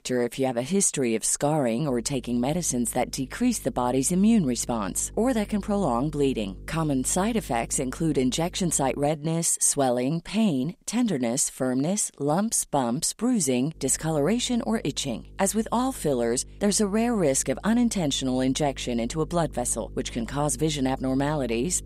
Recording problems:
electrical hum; faint; from 2 to 9 s and from 14 s on; 50 Hz, 30 dB below the speech

